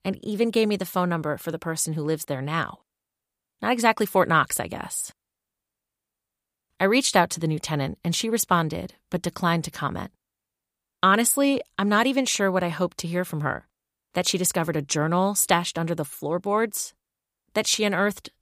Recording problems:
none

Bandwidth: 15 kHz